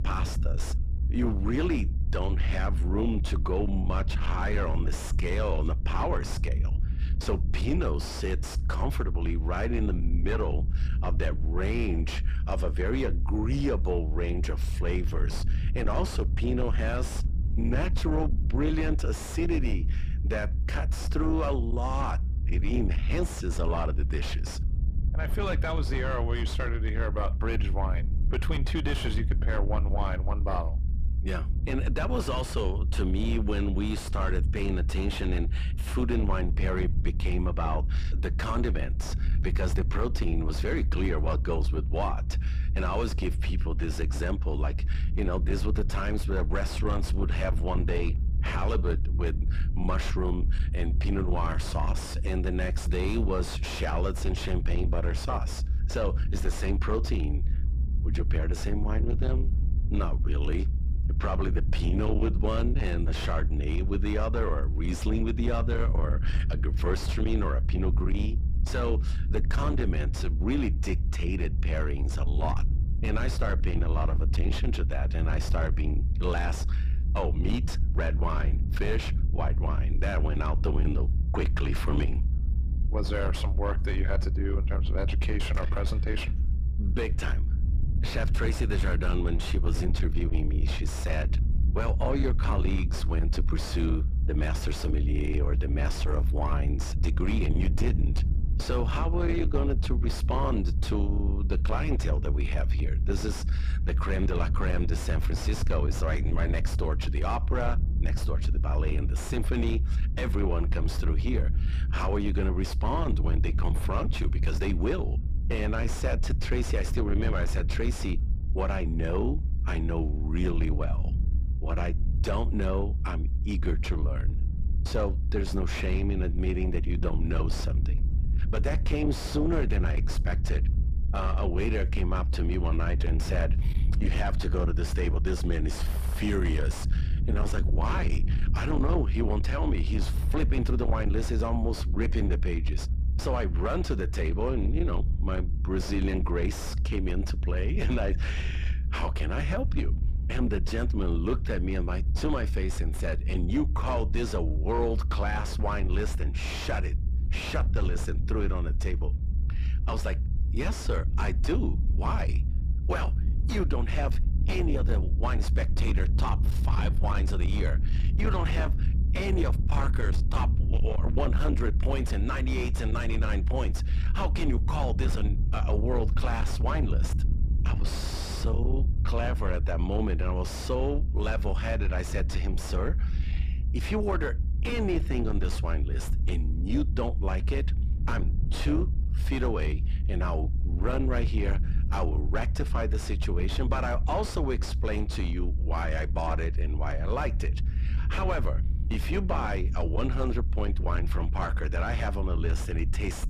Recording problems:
distortion; slight; 10 dB below the speech
low rumble; noticeable; throughout; 10 dB below the speech

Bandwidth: 14.5 kHz